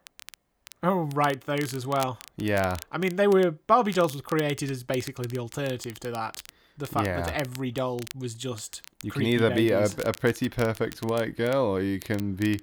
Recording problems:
crackle, like an old record; noticeable; 20 dB below the speech

